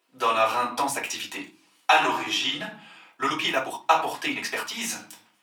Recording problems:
off-mic speech; far
thin; very; fading below 800 Hz
room echo; slight; dies away in 0.4 s
uneven, jittery; strongly; from 1 to 5 s

